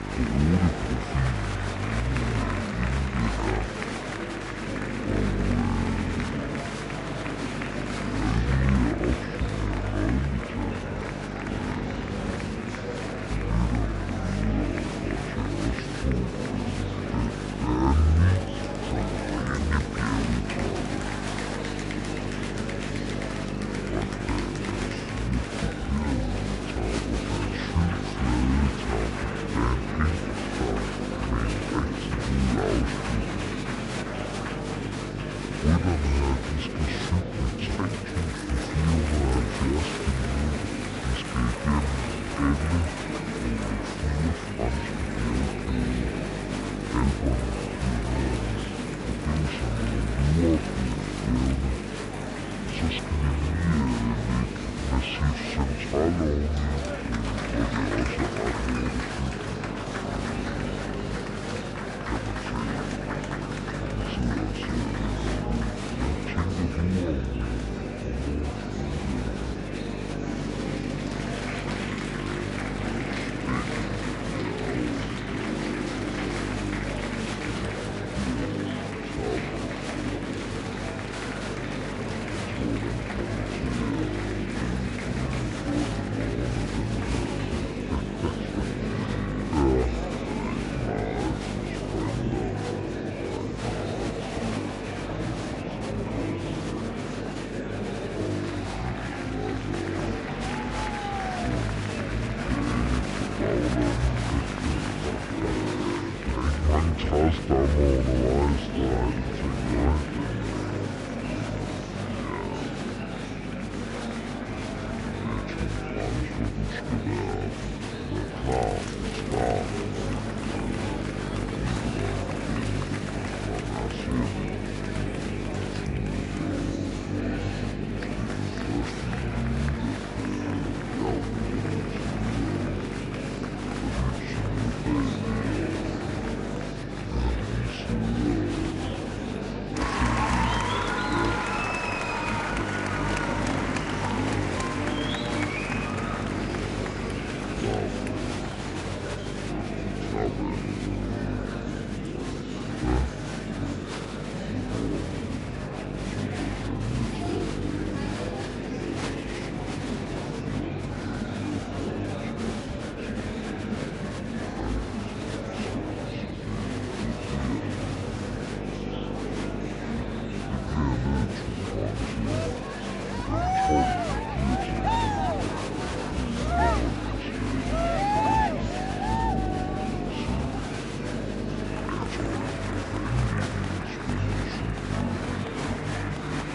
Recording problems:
wrong speed and pitch; too slow and too low; 0.6 times normal speed
electrical hum; loud; throughout; 50 Hz, 6 dB below the speech
murmuring crowd; loud; throughout; 2 dB below the speech

